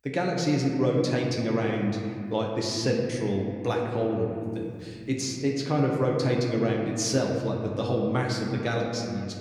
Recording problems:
room echo; noticeable; dies away in 2.2 s
off-mic speech; somewhat distant

